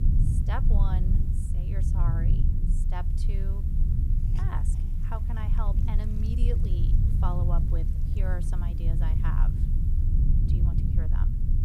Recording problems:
low rumble; loud; throughout; 1 dB below the speech
hiss; noticeable; throughout; 20 dB below the speech

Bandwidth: 15.5 kHz